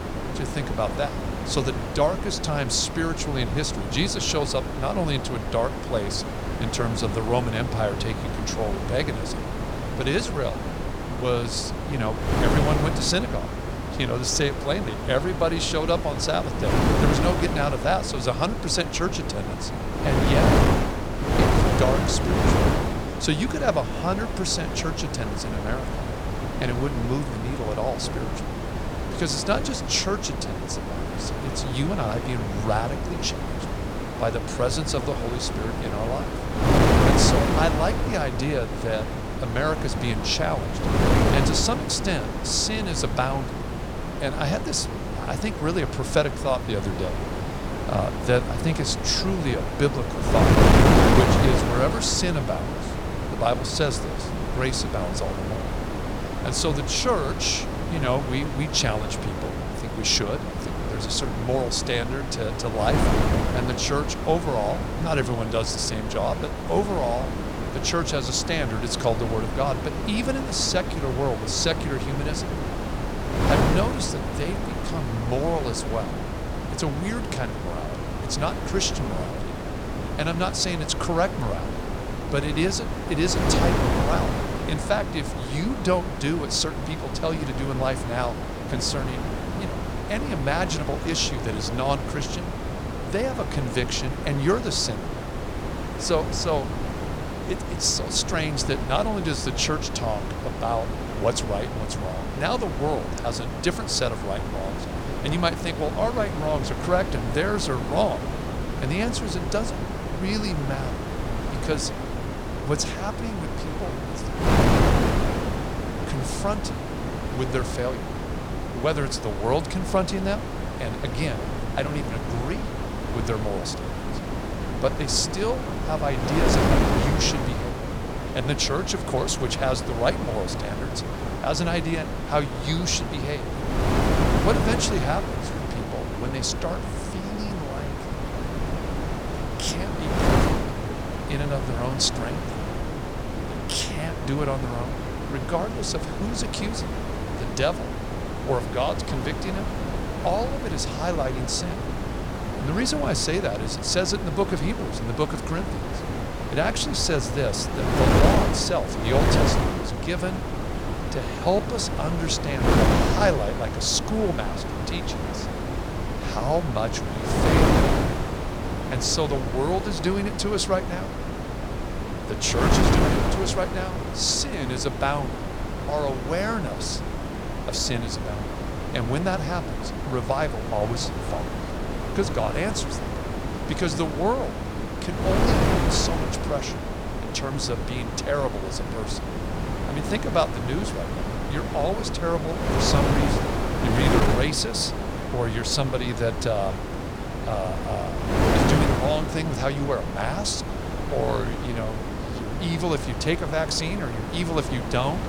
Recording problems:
wind noise on the microphone; heavy; 3 dB below the speech

